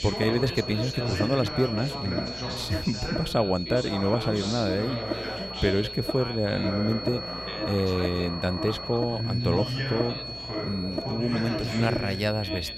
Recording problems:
electrical hum; loud; throughout; 60 Hz, 9 dB below the speech
high-pitched whine; loud; throughout; 4.5 kHz, 8 dB below the speech
background chatter; loud; throughout; 3 voices, 6 dB below the speech

